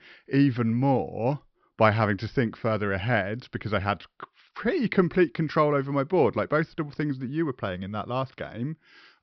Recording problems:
high frequencies cut off; noticeable; nothing above 5.5 kHz

